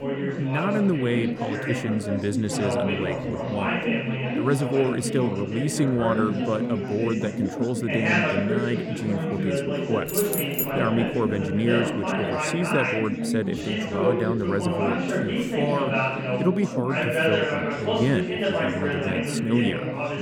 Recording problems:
chatter from many people; very loud; throughout; 1 dB above the speech
jangling keys; loud; at 10 s; peak 2 dB above the speech

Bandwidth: 17.5 kHz